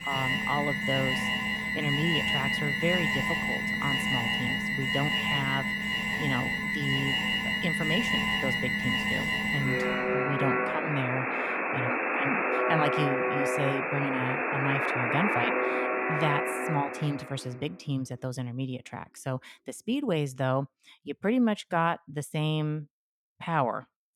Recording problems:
alarms or sirens; very loud; until 17 s; 5 dB above the speech

